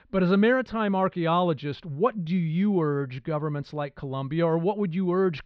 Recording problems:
muffled; slightly; fading above 4 kHz

